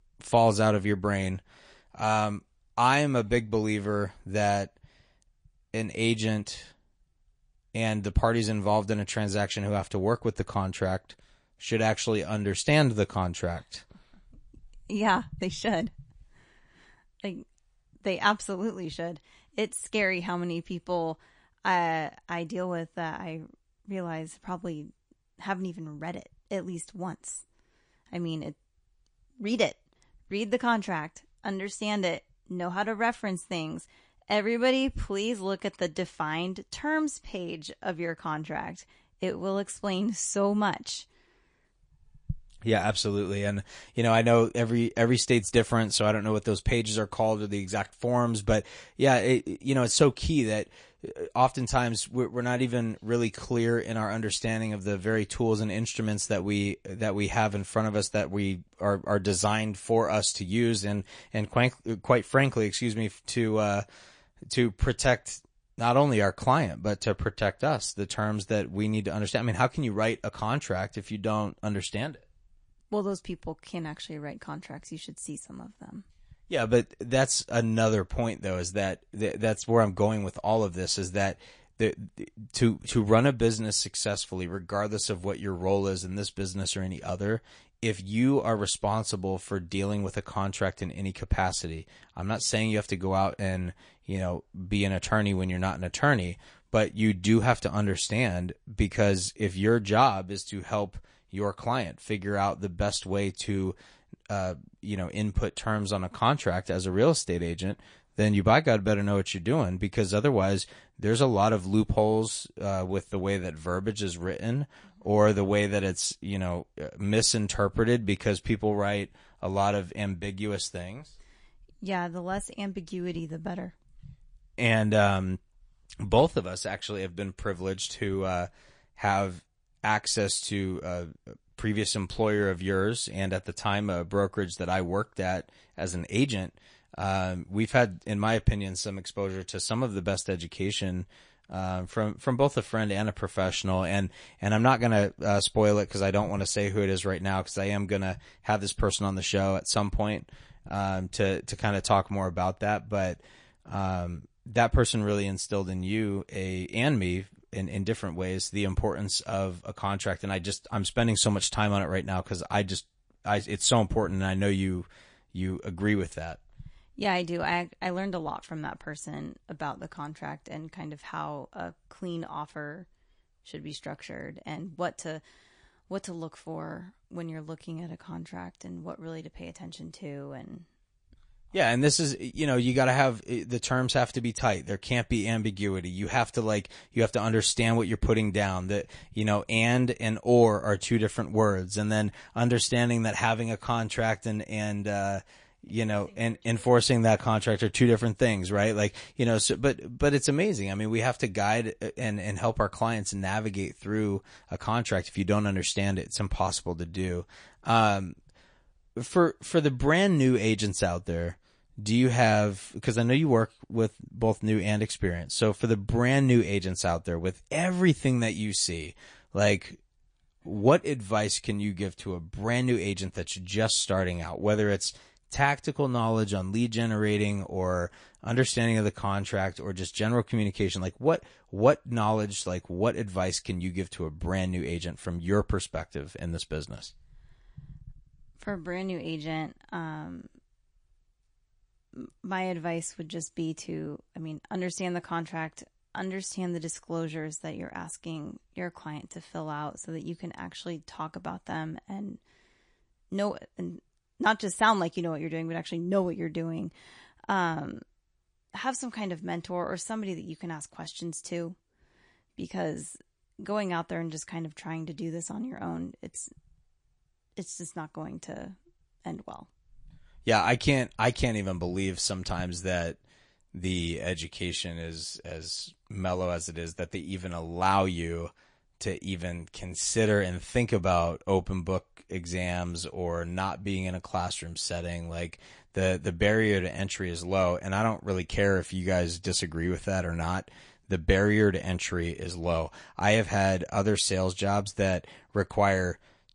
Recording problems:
garbled, watery; slightly

